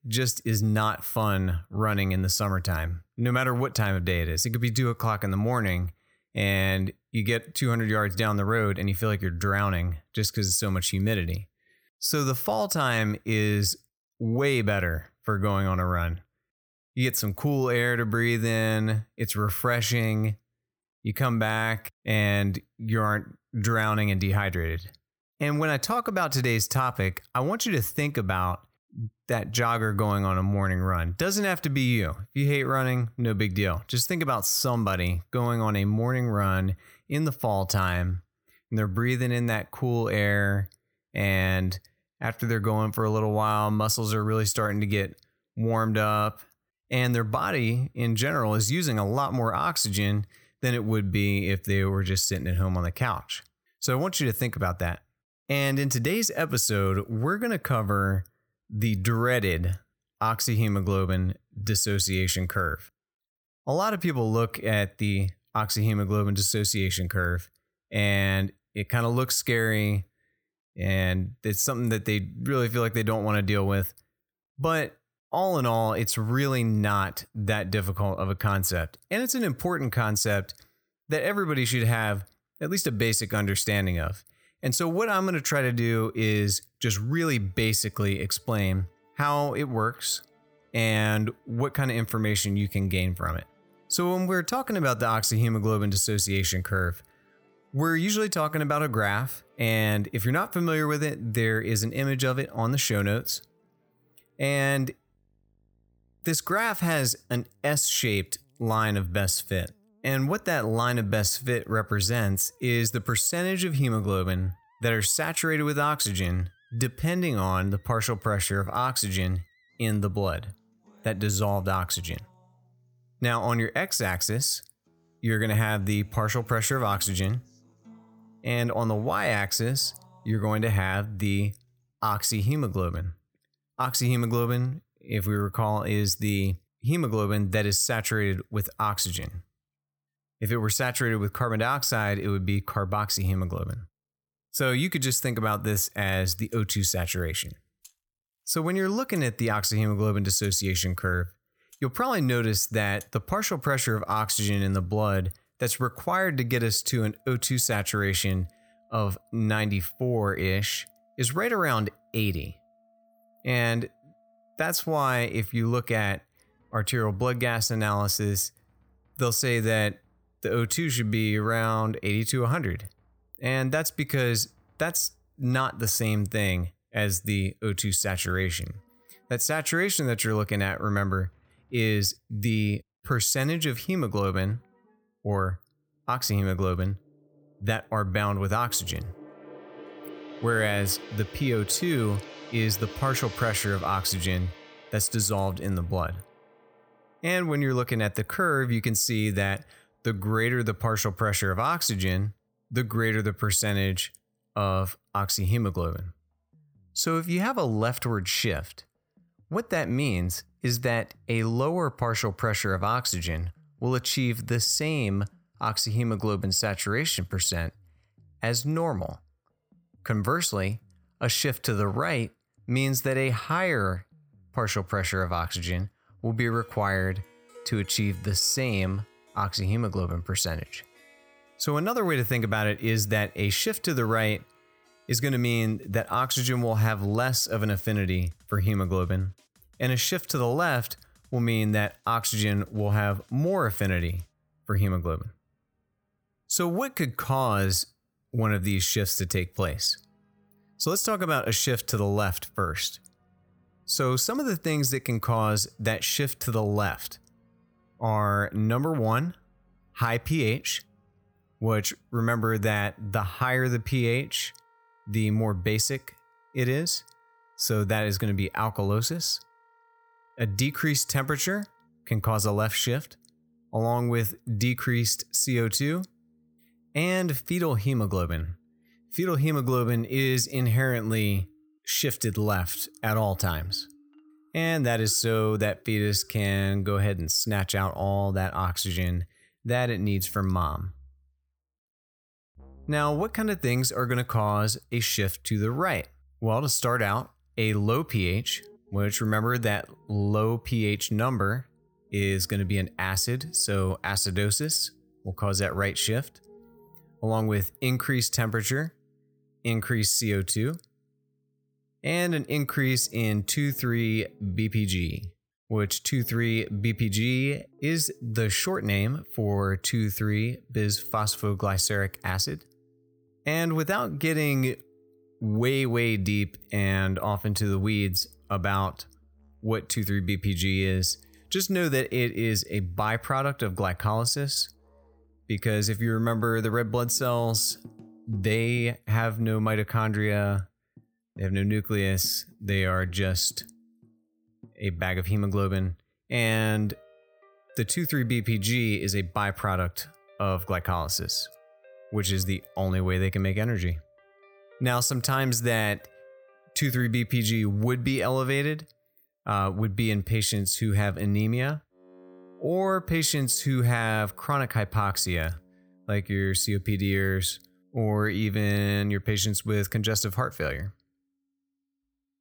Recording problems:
background music; faint; from 1:27 on; 30 dB below the speech

